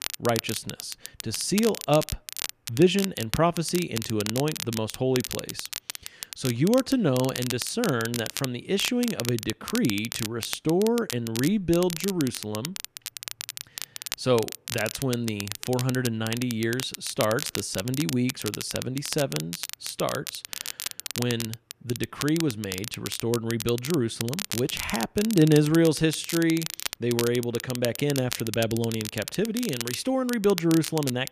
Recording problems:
crackle, like an old record; loud; 8 dB below the speech

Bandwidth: 14.5 kHz